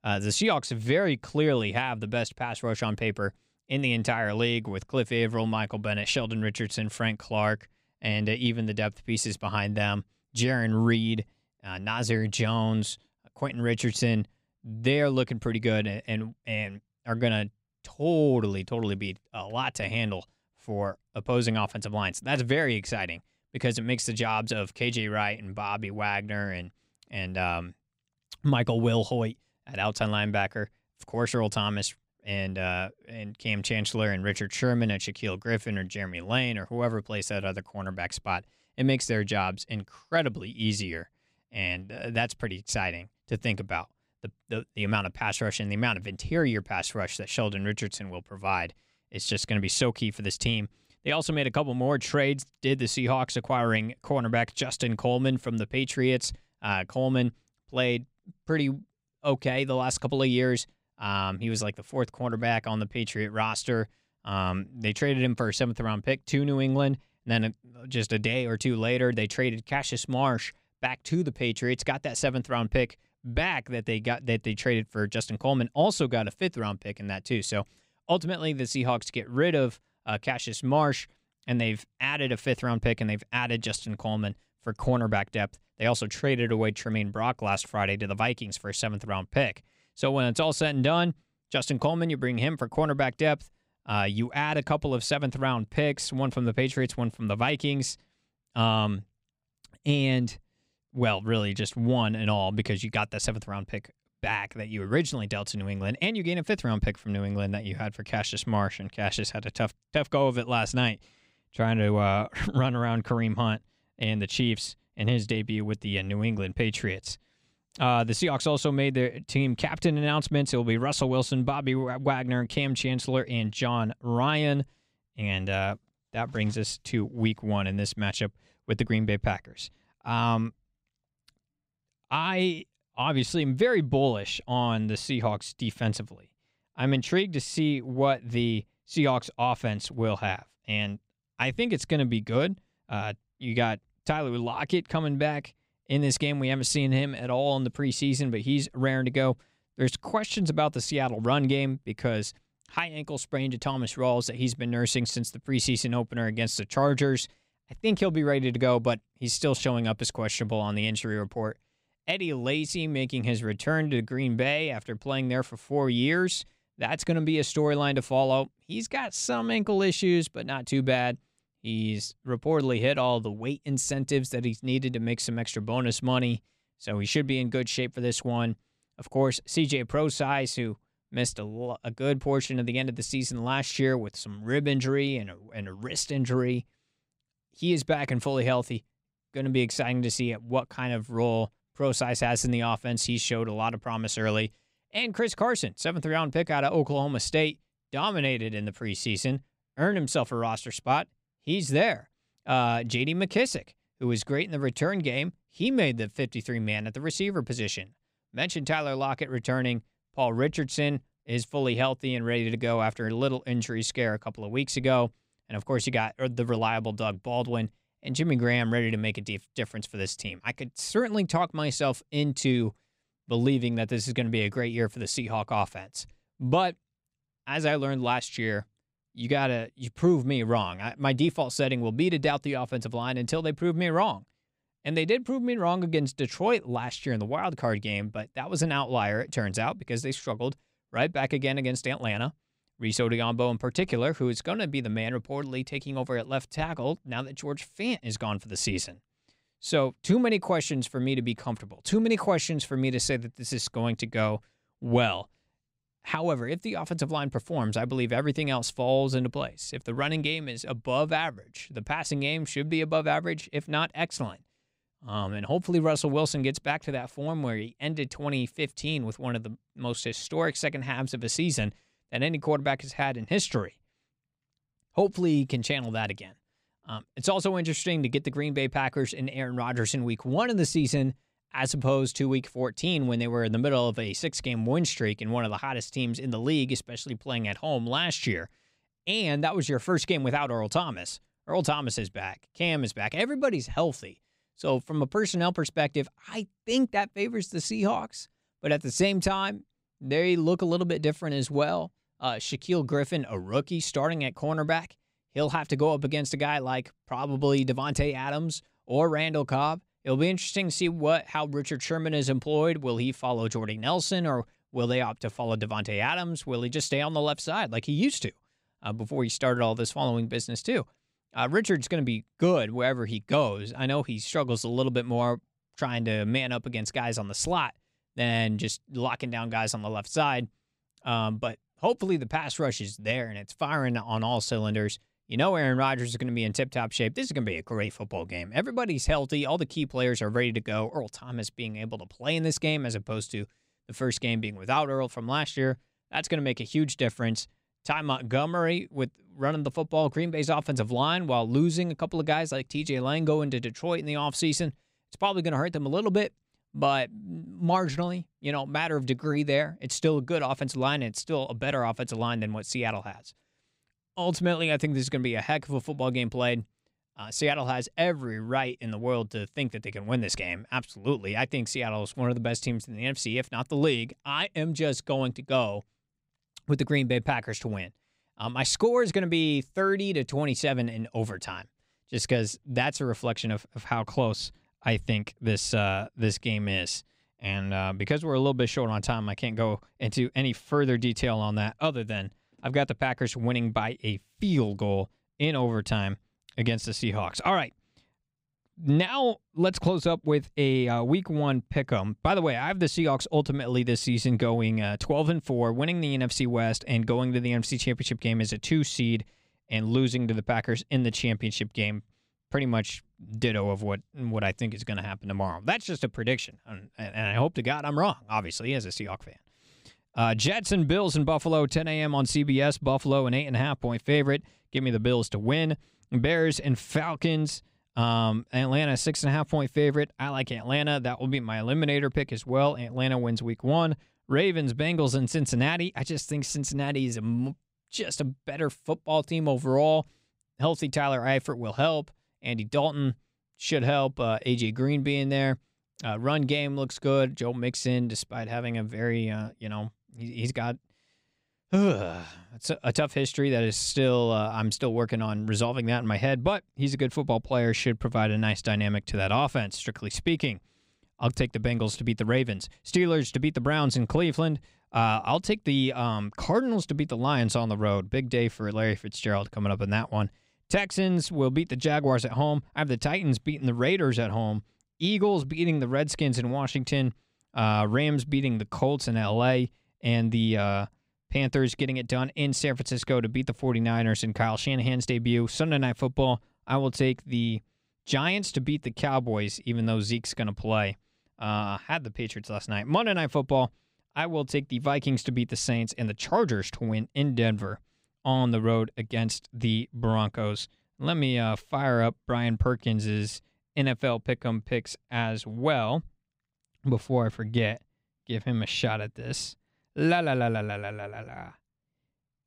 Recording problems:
none

